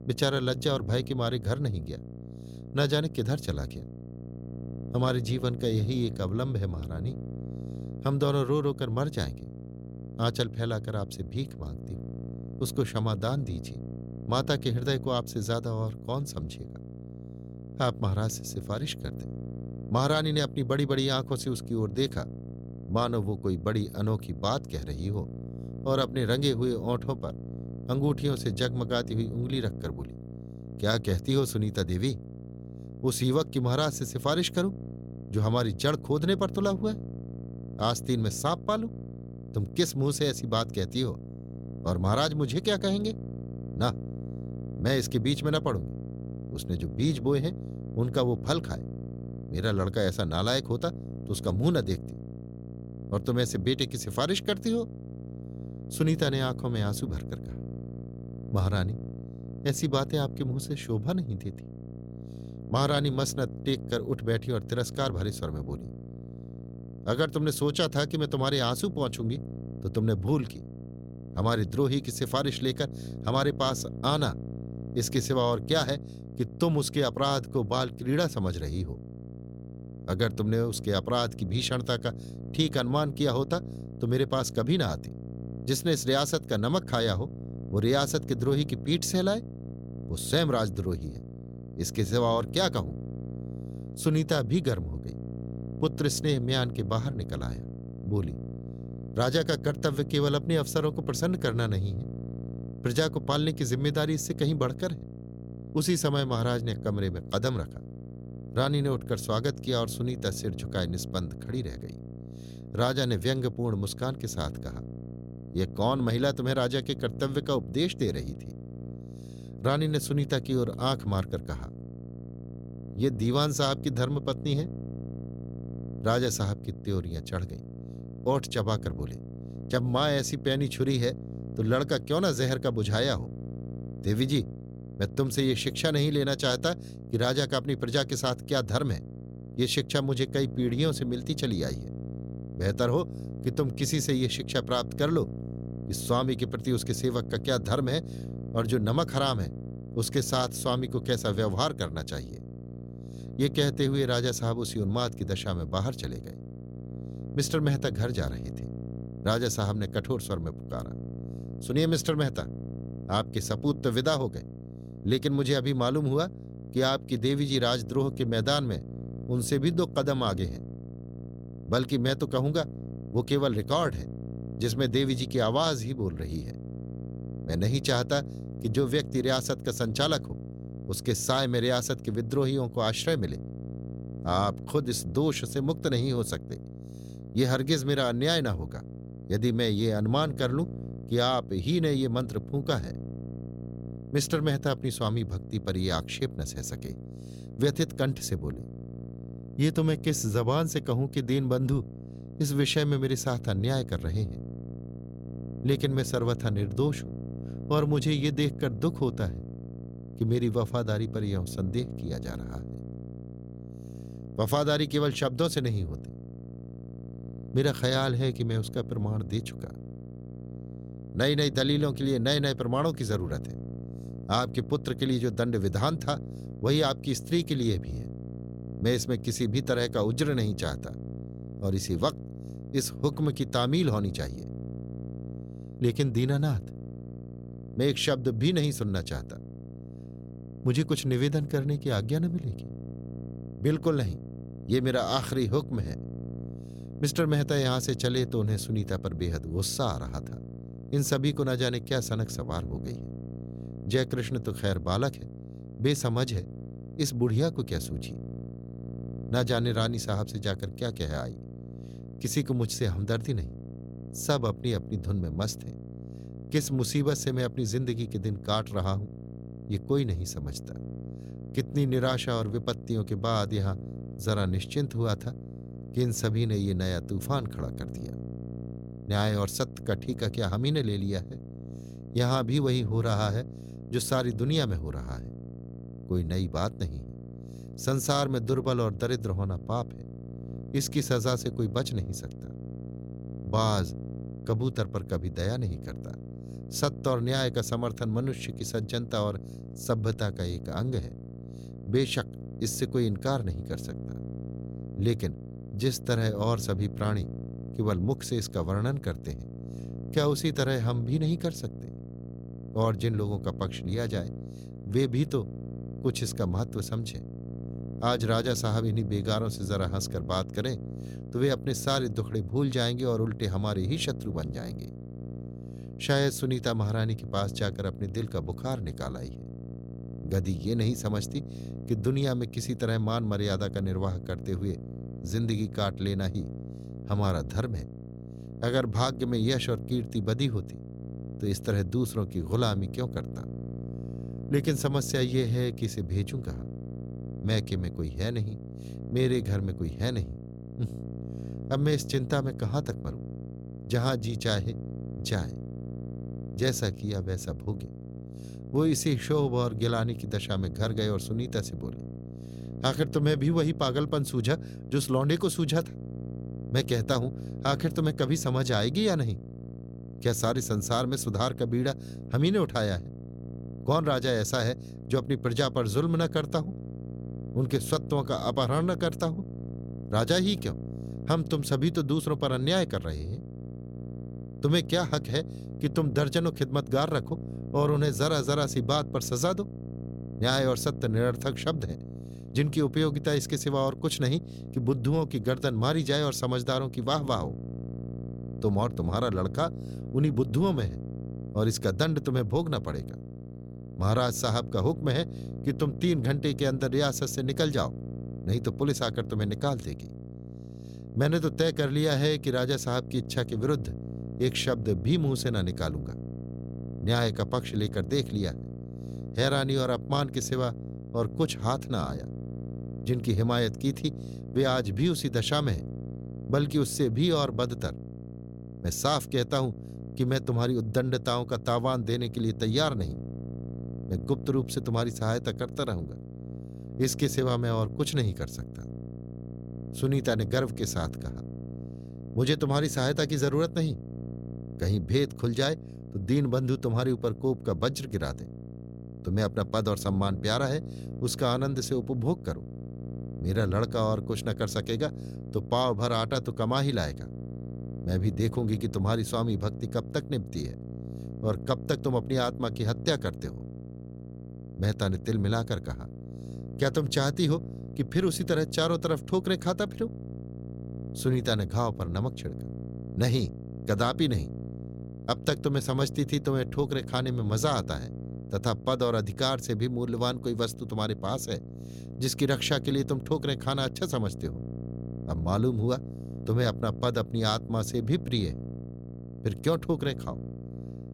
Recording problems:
electrical hum; noticeable; throughout; 60 Hz, 15 dB below the speech

